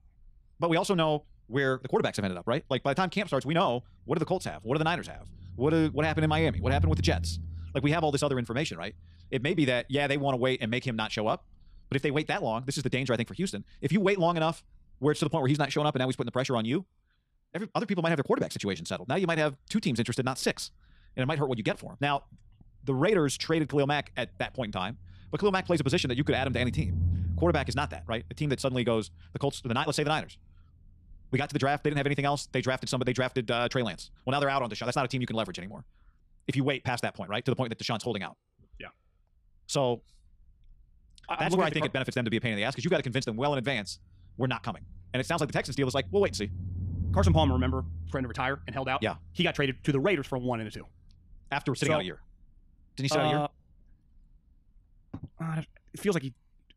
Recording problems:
wrong speed, natural pitch; too fast; 1.6 times normal speed
low rumble; faint; throughout; 20 dB below the speech

